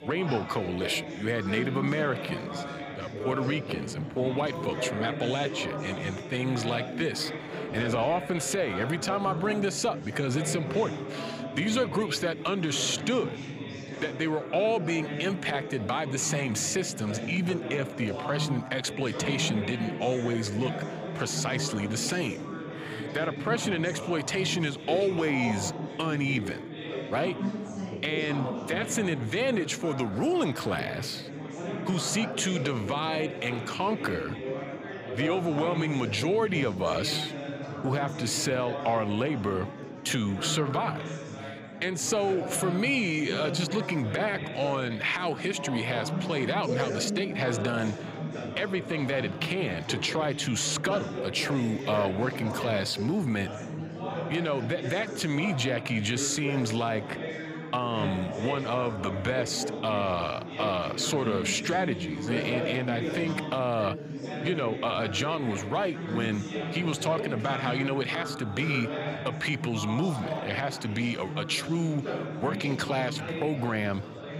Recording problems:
chatter from many people; loud; throughout; 6 dB below the speech

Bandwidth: 15.5 kHz